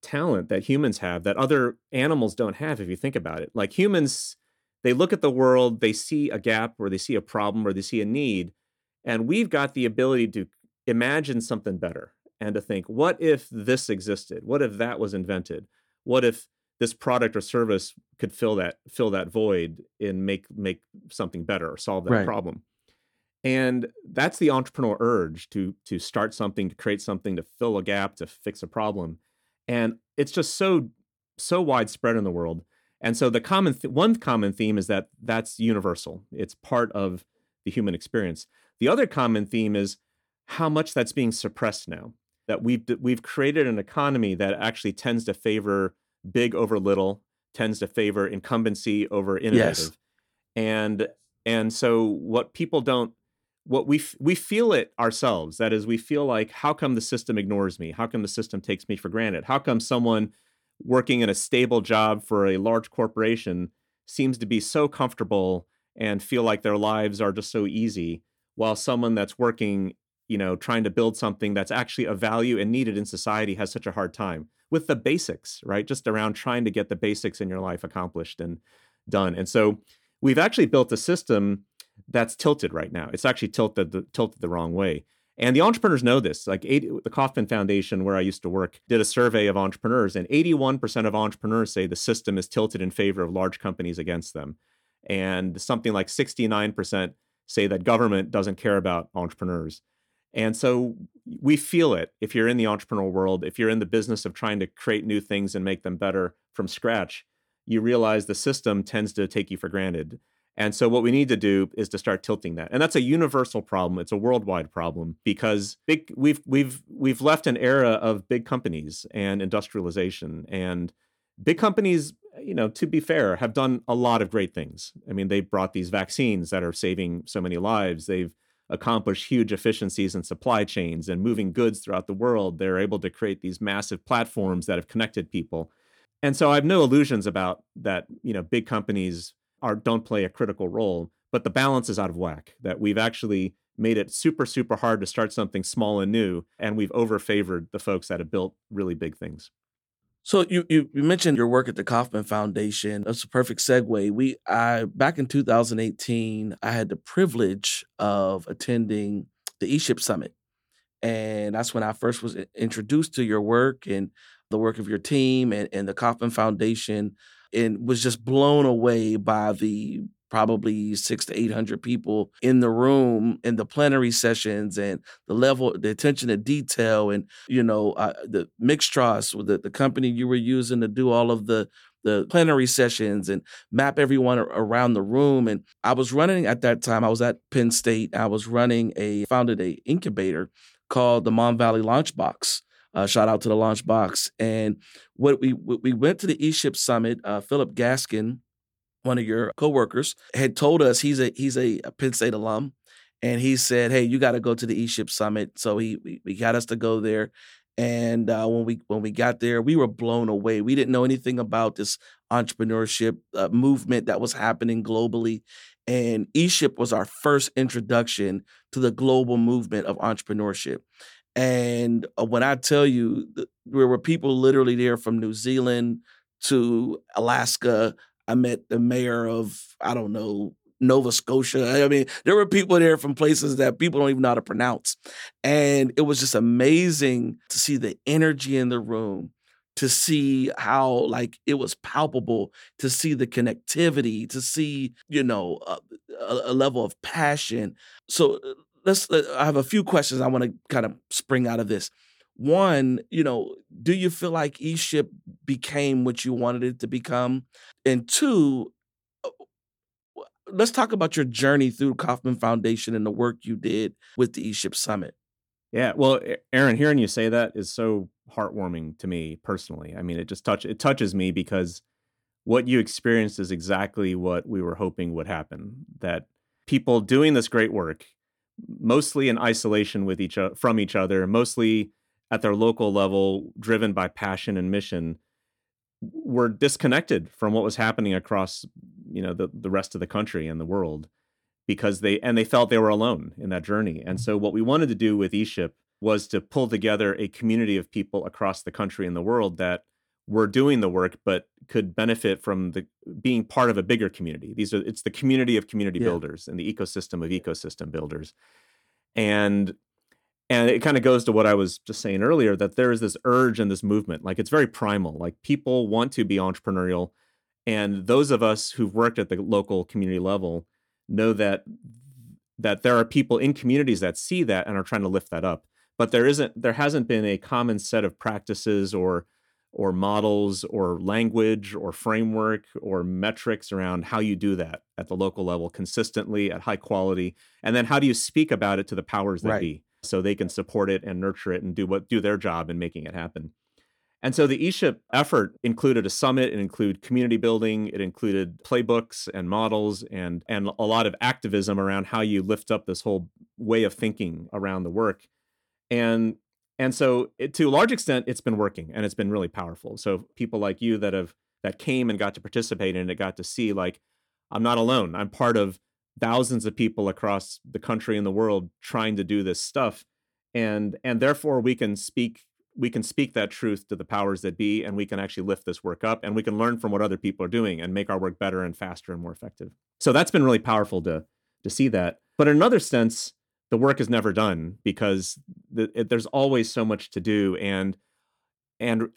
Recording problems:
none

